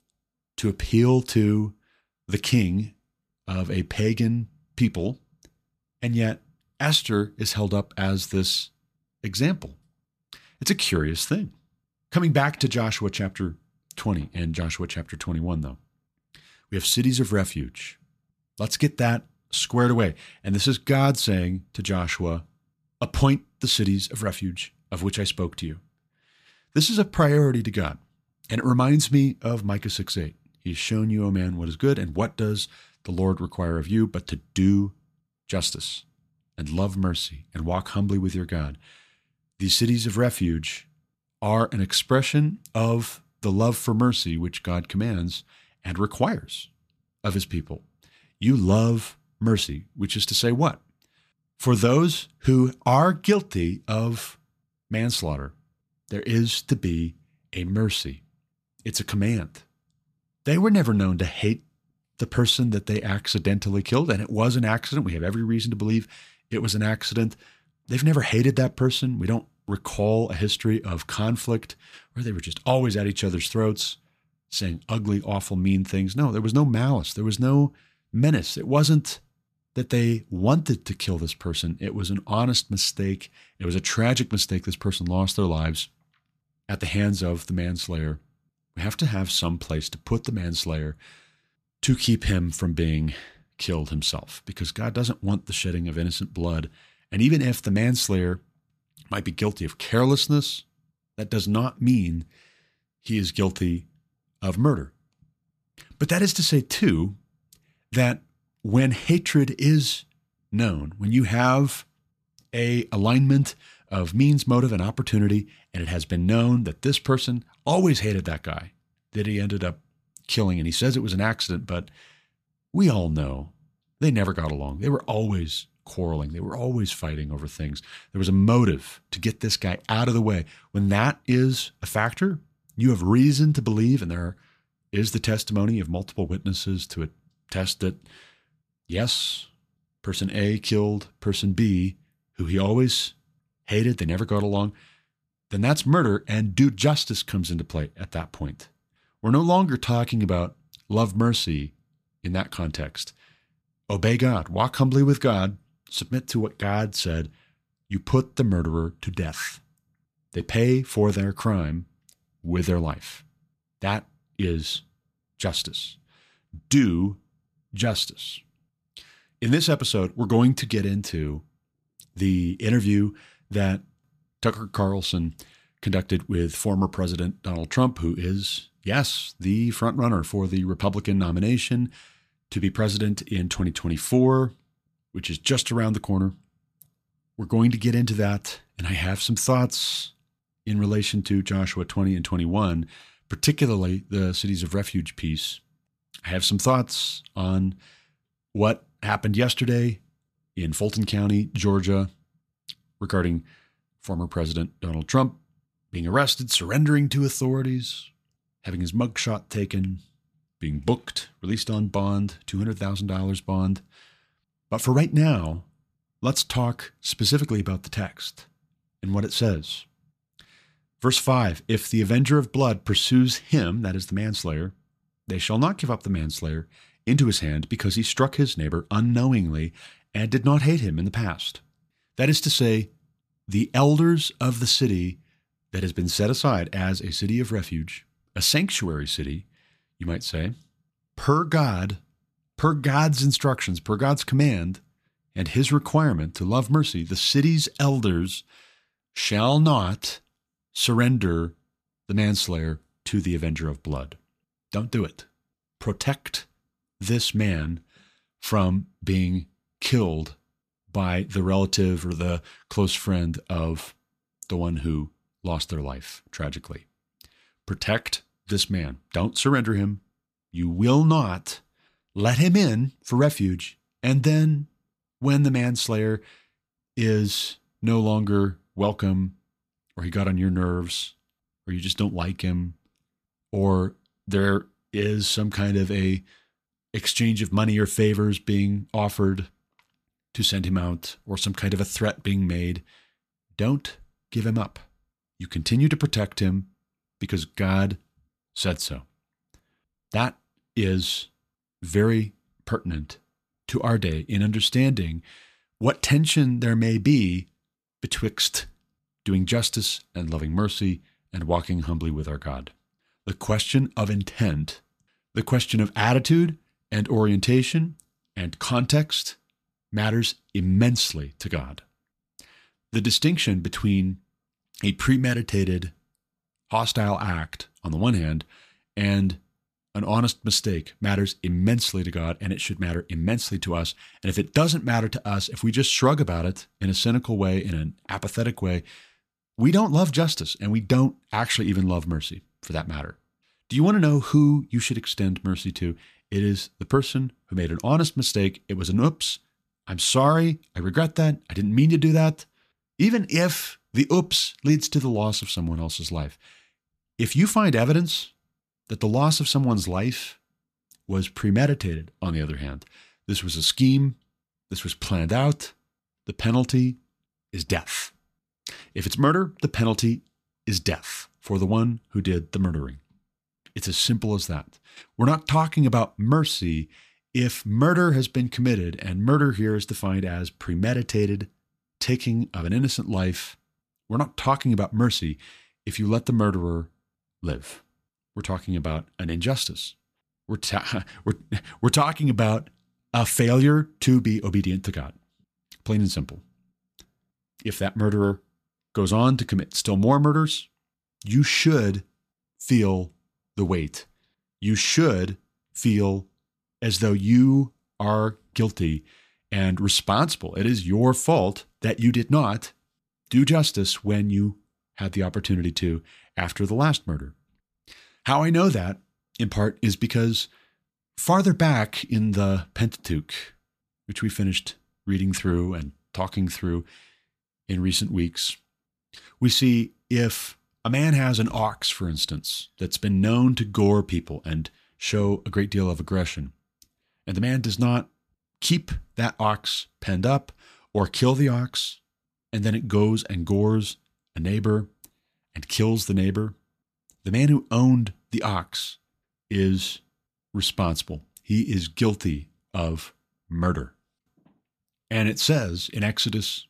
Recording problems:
none

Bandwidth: 14.5 kHz